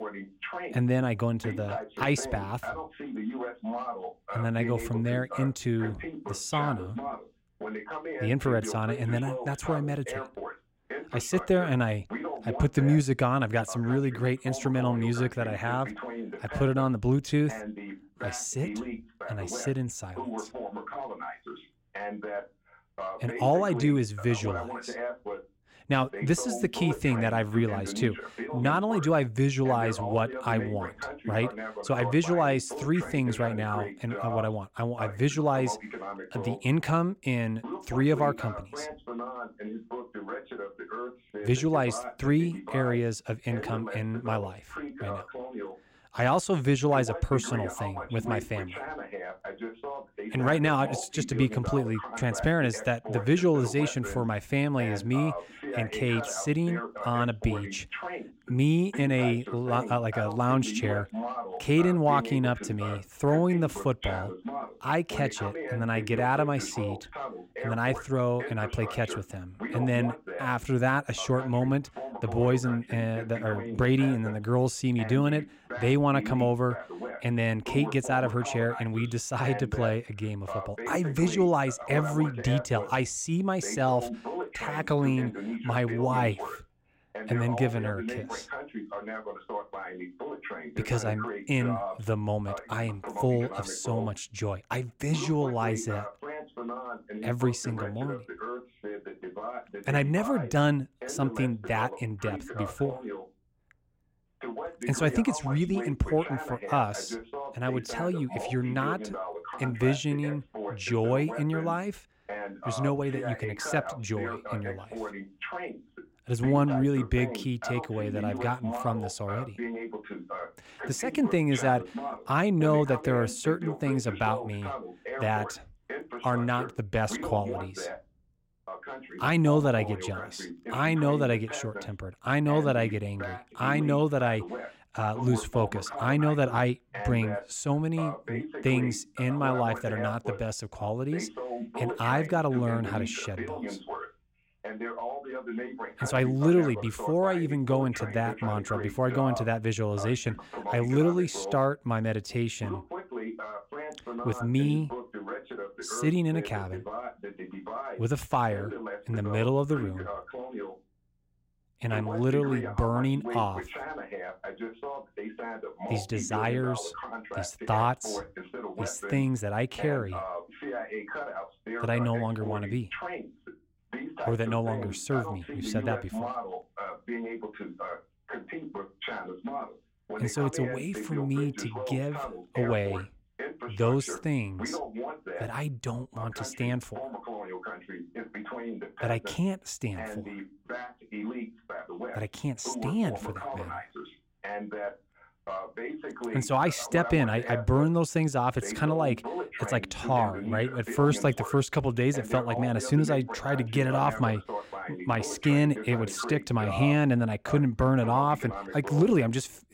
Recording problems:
voice in the background; loud; throughout; 9 dB below the speech

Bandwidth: 16 kHz